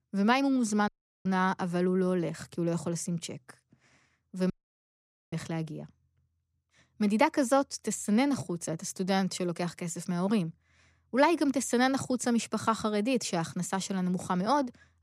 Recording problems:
audio cutting out; at 1 s and at 4.5 s for 1 s

